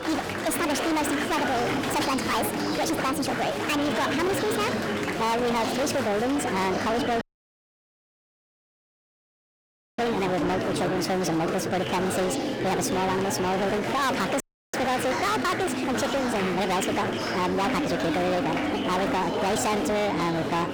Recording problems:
distortion; heavy; 33% of the sound clipped
wrong speed and pitch; too fast and too high; 1.5 times normal speed
murmuring crowd; loud; throughout; 2 dB below the speech
audio cutting out; at 7 s for 3 s and at 14 s

